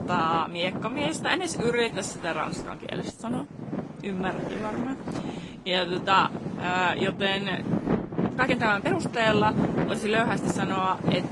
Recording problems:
garbled, watery; slightly; nothing above 10.5 kHz
traffic noise; loud; throughout; 5 dB below the speech
household noises; noticeable; throughout; 15 dB below the speech
uneven, jittery; strongly; from 1 to 11 s

